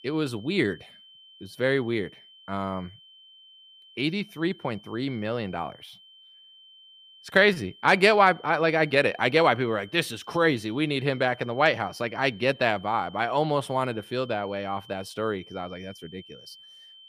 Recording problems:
high-pitched whine; faint; throughout; 3 kHz, 25 dB below the speech

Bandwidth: 15 kHz